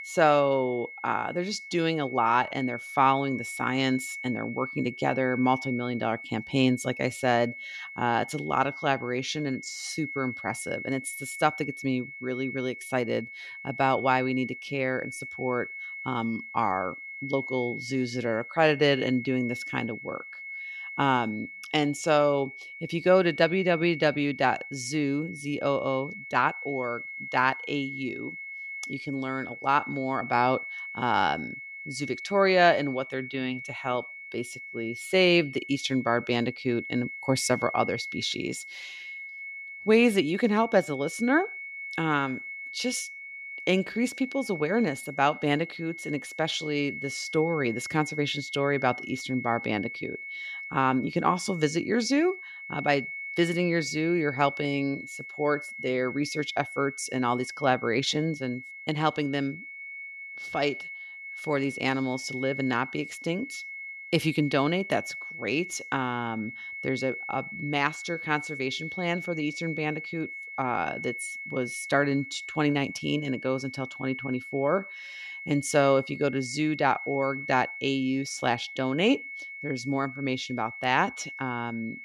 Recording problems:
high-pitched whine; loud; throughout; 2 kHz, 10 dB below the speech

